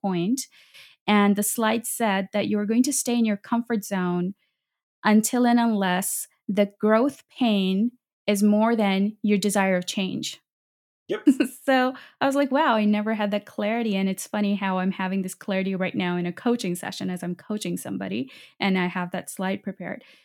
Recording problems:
none

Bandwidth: 17.5 kHz